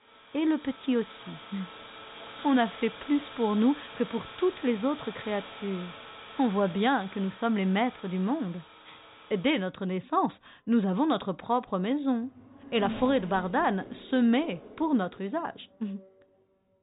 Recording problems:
high frequencies cut off; severe; nothing above 4 kHz
traffic noise; noticeable; throughout; 15 dB below the speech

